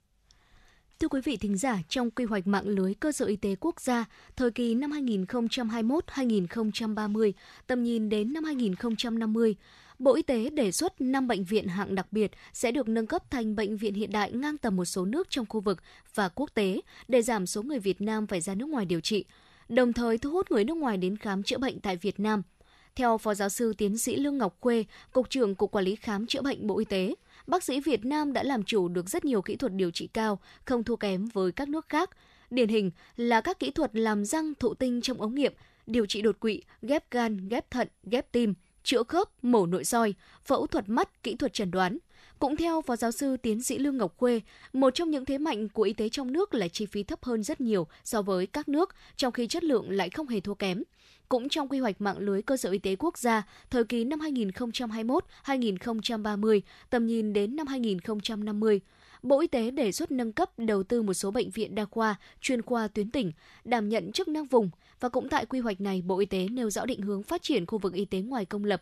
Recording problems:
none

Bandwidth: 13.5 kHz